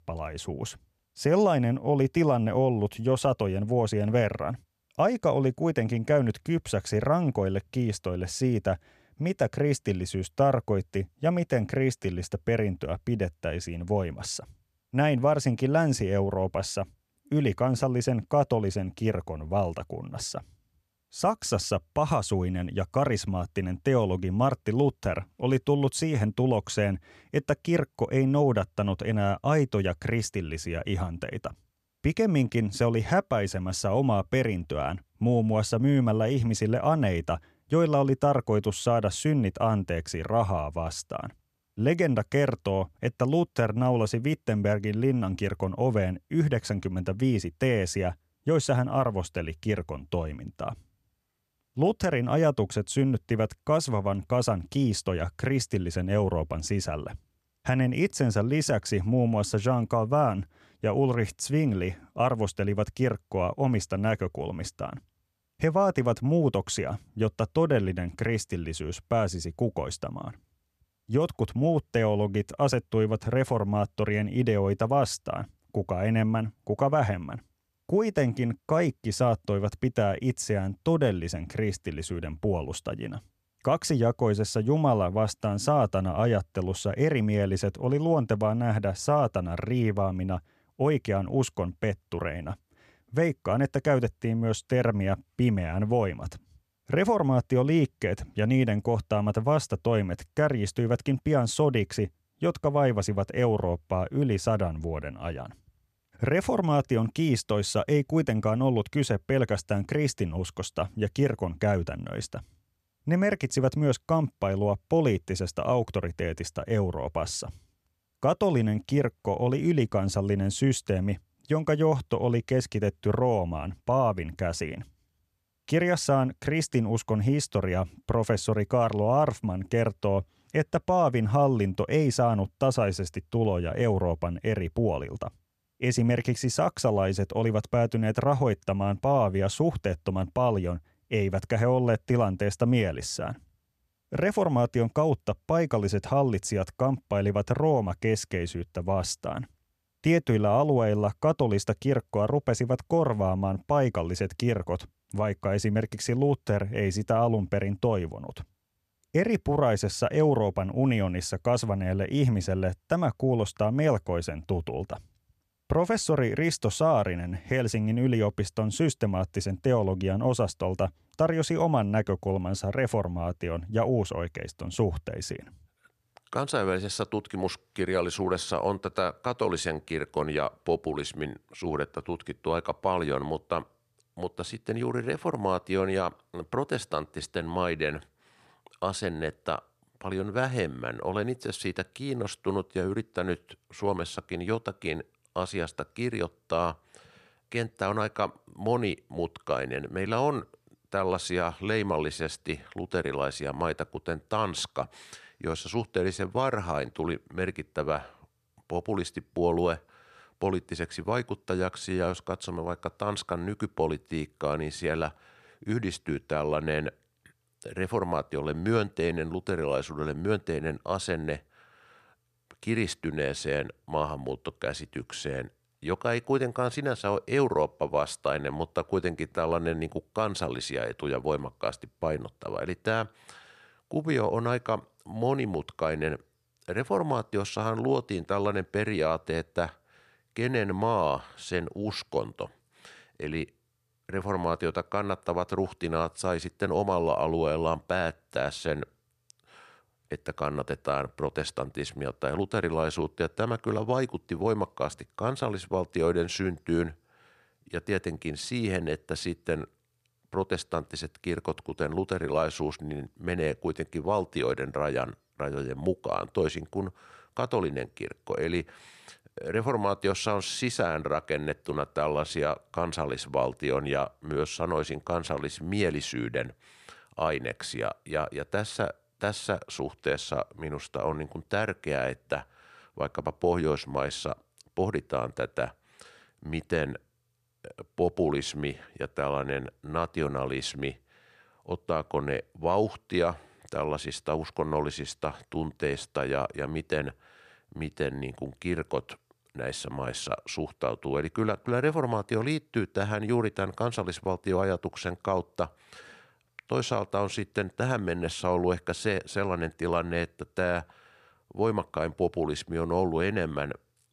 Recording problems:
none

